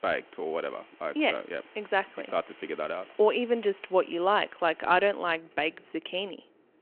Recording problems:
phone-call audio
wind in the background; faint; throughout; 25 dB below the speech

